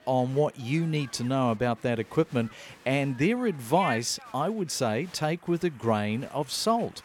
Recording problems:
crowd noise; noticeable; throughout; 20 dB below the speech

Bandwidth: 17 kHz